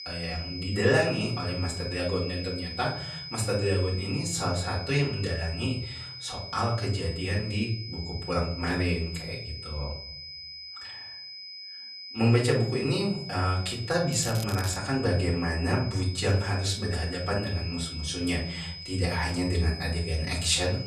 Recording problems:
off-mic speech; far
room echo; slight; dies away in 0.5 s
high-pitched whine; loud; throughout; 5 kHz, 9 dB below the speech
crackling; noticeable; at 14 s; 15 dB below the speech

